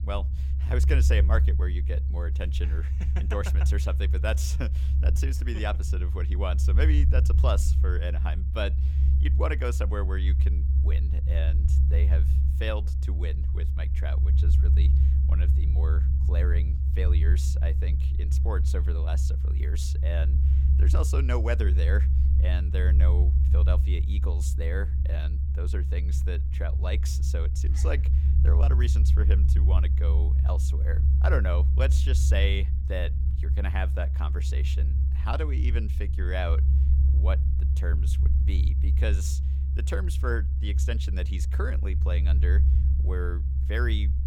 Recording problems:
low rumble; loud; throughout; 6 dB below the speech

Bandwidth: 17 kHz